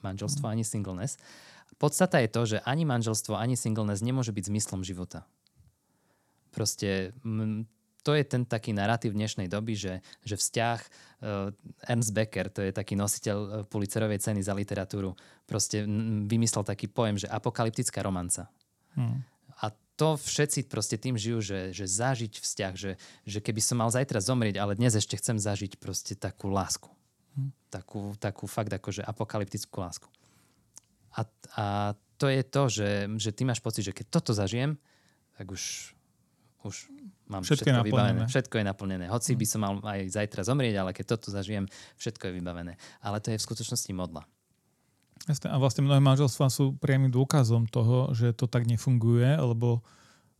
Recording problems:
none

